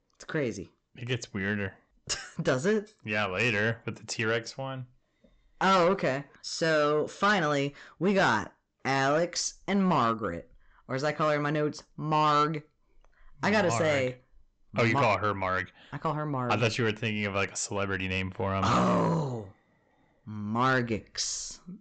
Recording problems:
high frequencies cut off; noticeable; nothing above 8 kHz
distortion; slight; 10 dB below the speech

